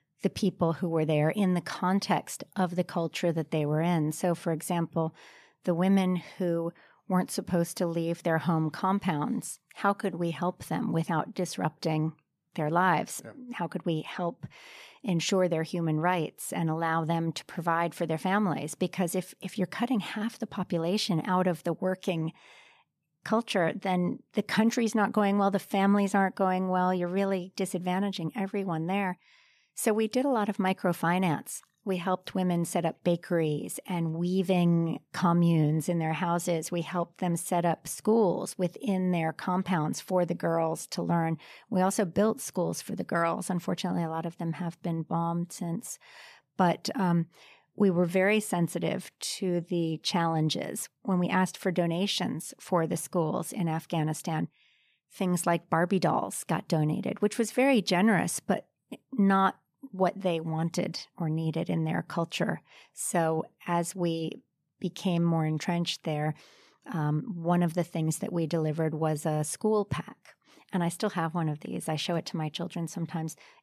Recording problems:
none

